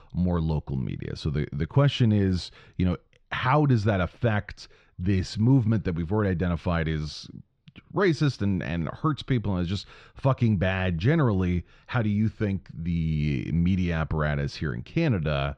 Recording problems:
muffled; slightly; fading above 4.5 kHz

